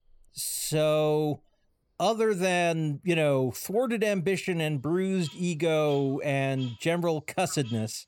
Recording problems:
animal sounds; faint; throughout; 20 dB below the speech

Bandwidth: 18 kHz